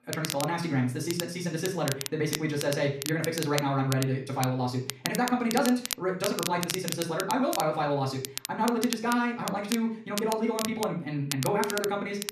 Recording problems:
off-mic speech; far
wrong speed, natural pitch; too fast; 1.8 times normal speed
room echo; slight; dies away in 0.5 s
crackle, like an old record; loud; 7 dB below the speech

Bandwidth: 14 kHz